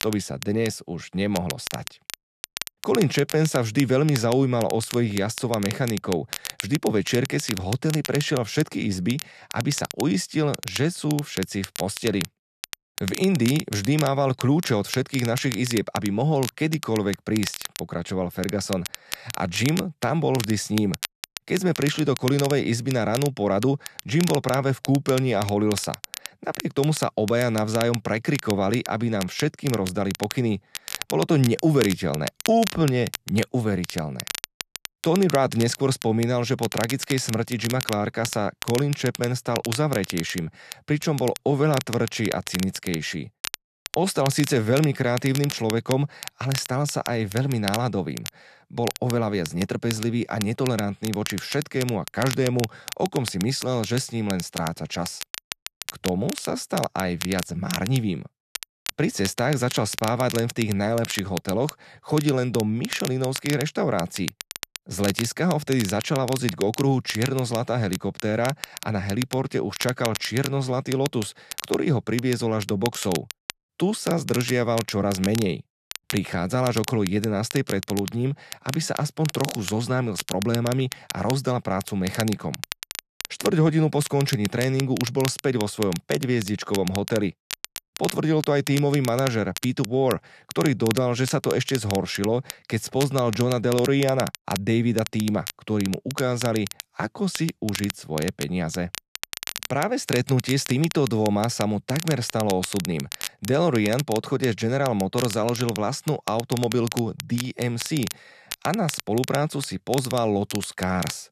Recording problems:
crackle, like an old record; loud; 10 dB below the speech

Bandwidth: 13.5 kHz